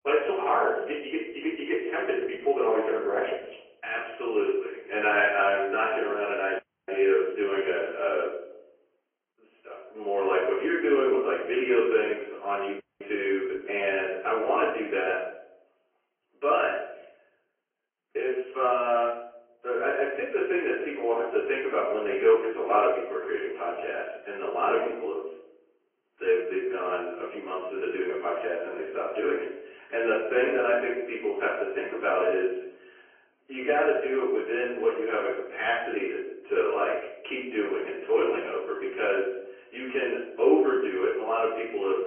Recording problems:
off-mic speech; far
room echo; noticeable; dies away in 0.7 s
phone-call audio; nothing above 2.5 kHz
garbled, watery; slightly
audio cutting out; at 6.5 s and at 13 s

